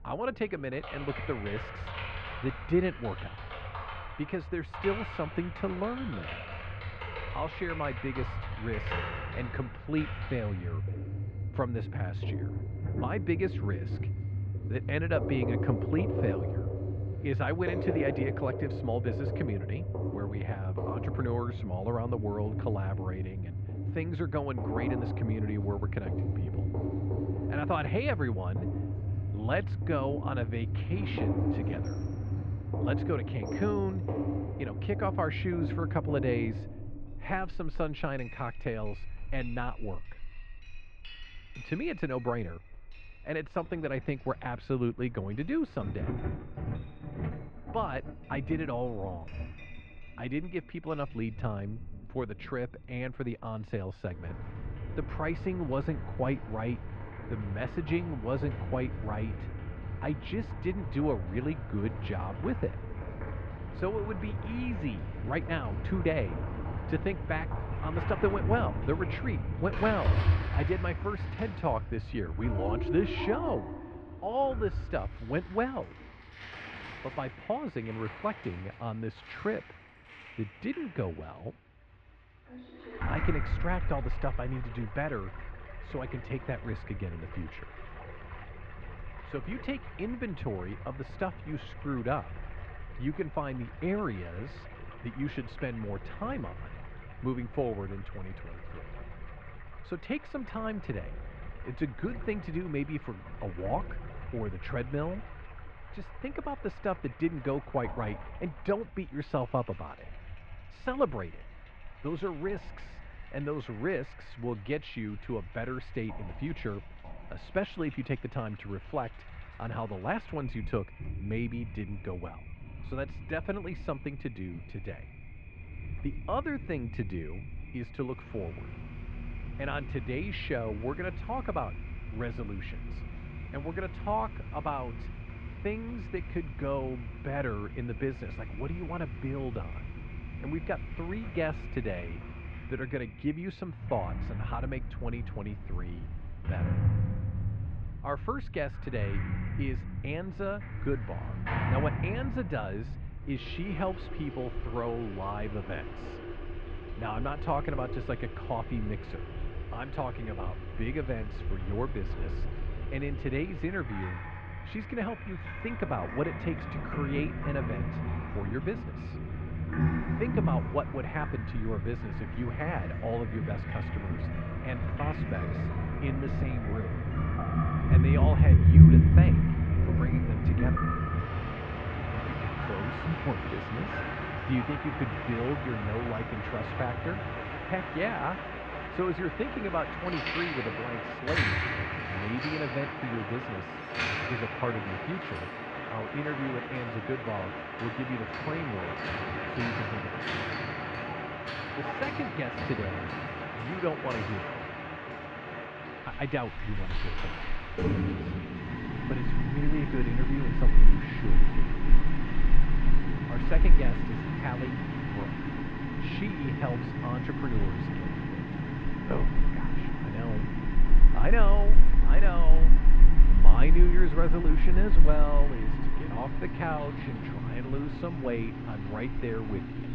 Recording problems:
muffled; very; fading above 2.5 kHz
rain or running water; very loud; throughout; 3 dB above the speech
household noises; loud; throughout; 2 dB below the speech

